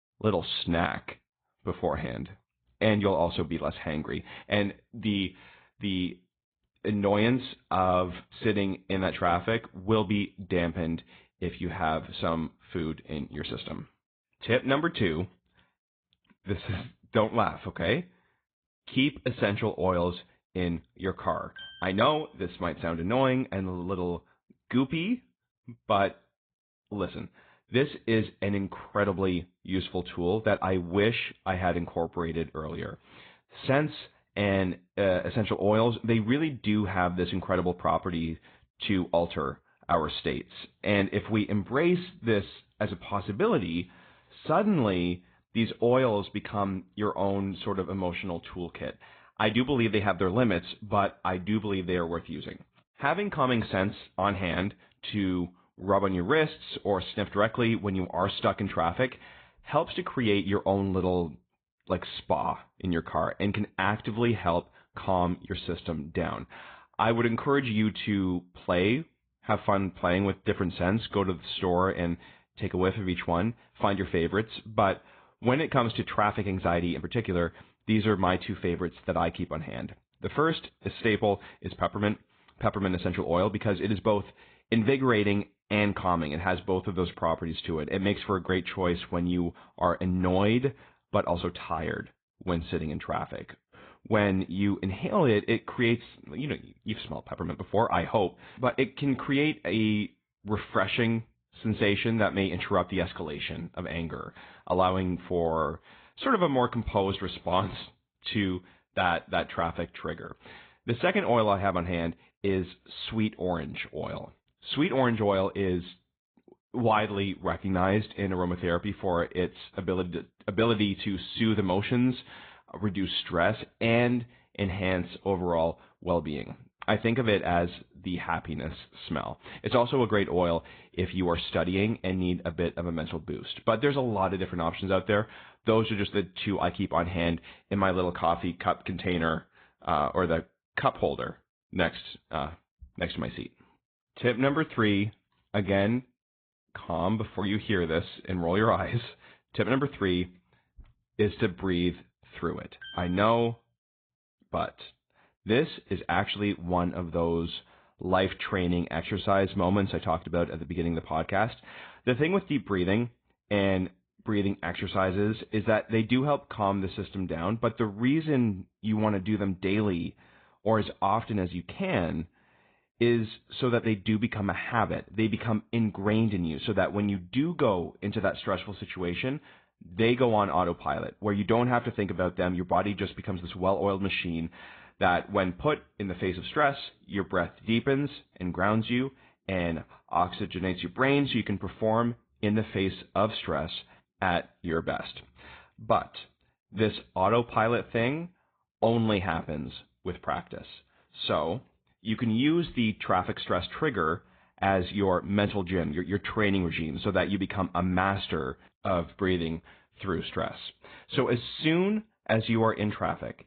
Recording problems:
high frequencies cut off; severe; nothing above 4 kHz
garbled, watery; slightly

